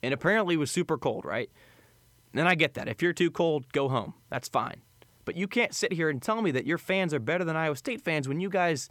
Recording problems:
none

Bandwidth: 18.5 kHz